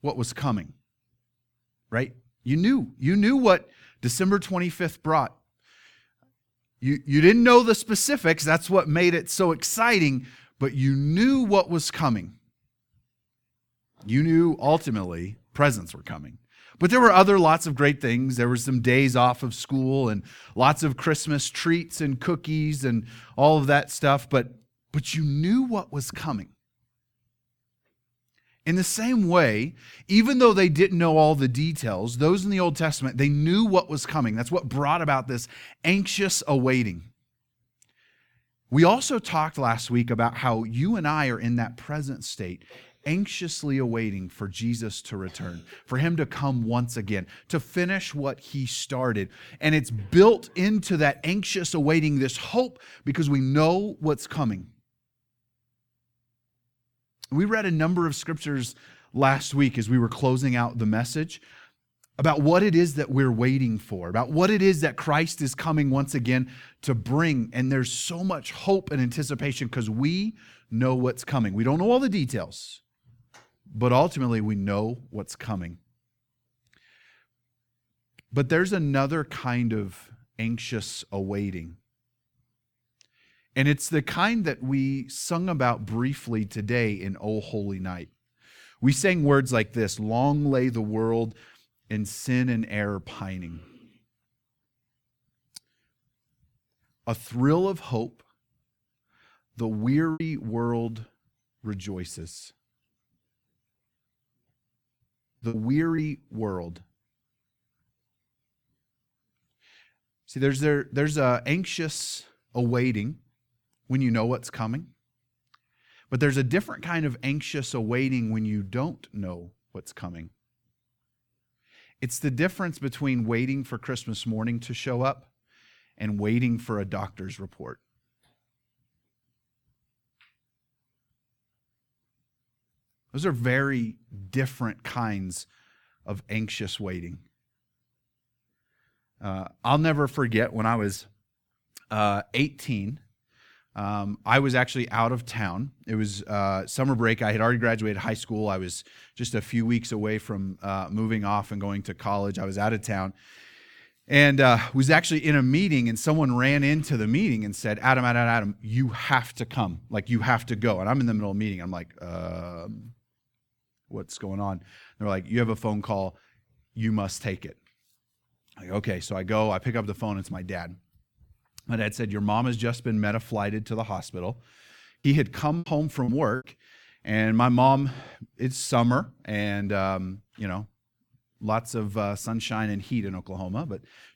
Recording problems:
choppy; very; at 1:40, at 1:45 and at 2:56; 10% of the speech affected

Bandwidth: 18 kHz